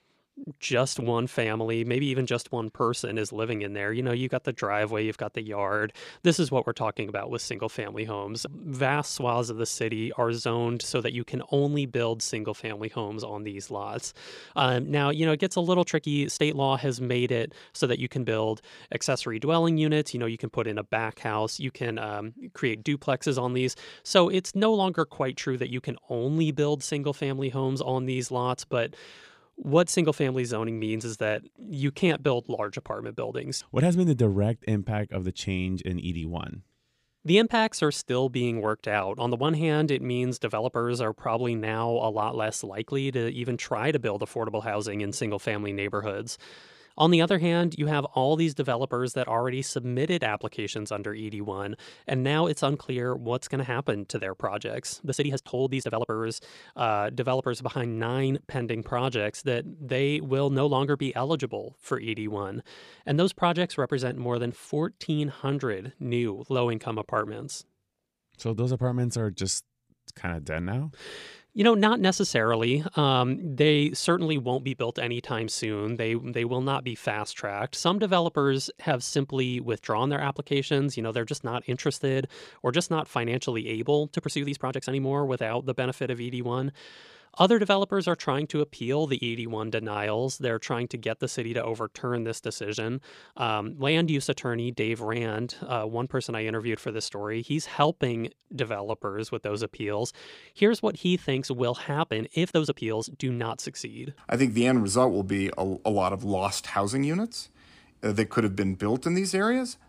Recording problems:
uneven, jittery; strongly; from 16 s to 1:43

